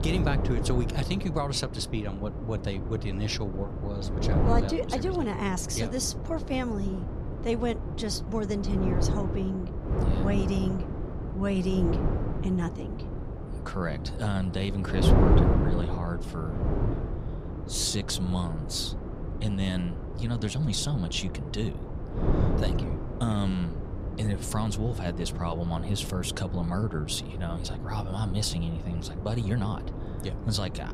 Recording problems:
wind noise on the microphone; heavy; 4 dB below the speech

